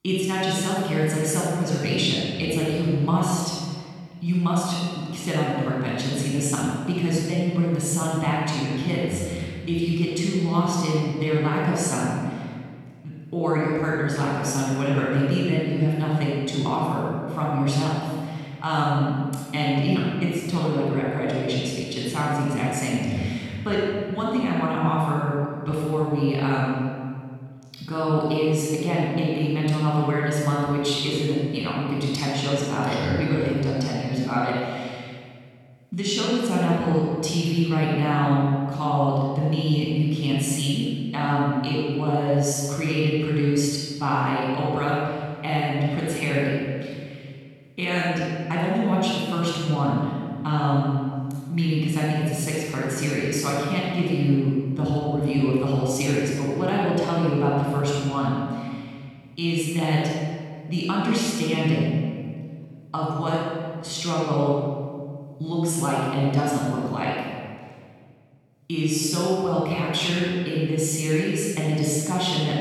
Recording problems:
room echo; strong; dies away in 1.7 s
off-mic speech; far

